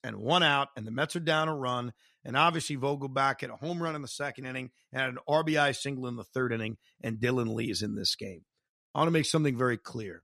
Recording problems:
none

